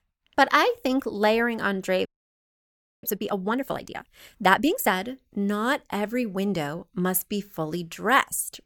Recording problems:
audio freezing; at 2 s for 1 s

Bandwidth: 18.5 kHz